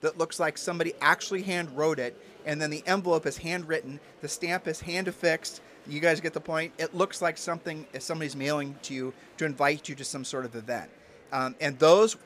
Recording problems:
murmuring crowd; faint; throughout; 25 dB below the speech

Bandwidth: 15 kHz